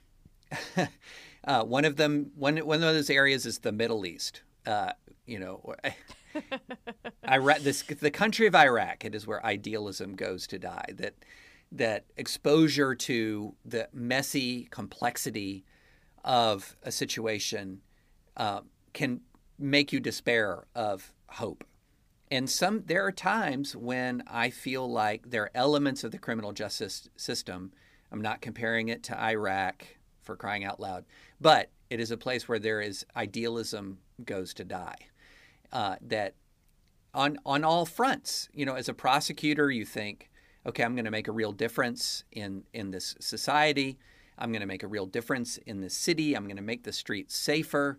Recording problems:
none

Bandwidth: 15 kHz